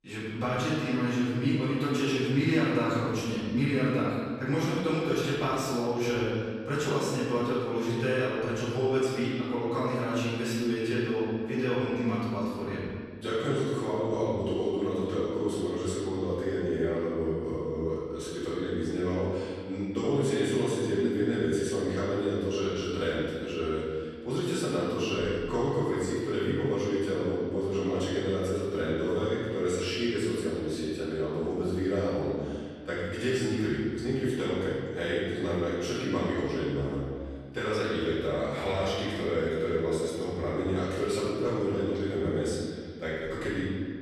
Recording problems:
room echo; strong; dies away in 1.8 s
off-mic speech; far

